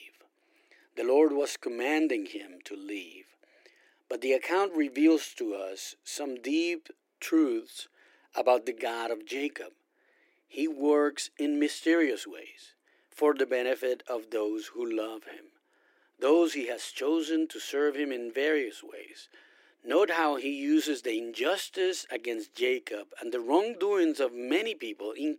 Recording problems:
thin; somewhat; fading below 300 Hz

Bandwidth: 16 kHz